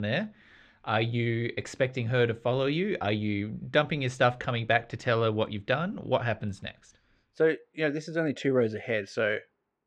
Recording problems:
muffled; slightly; fading above 3.5 kHz
abrupt cut into speech; at the start

